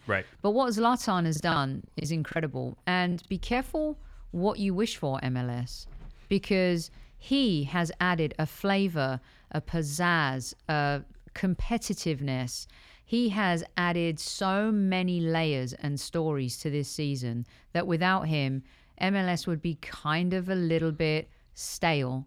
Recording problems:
choppy; very; from 1.5 to 3.5 s; 11% of the speech affected

